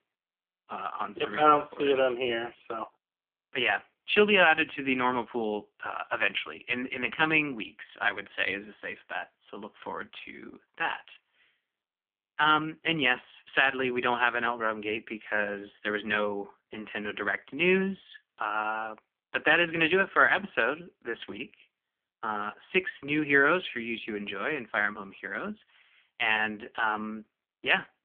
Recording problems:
phone-call audio; poor line

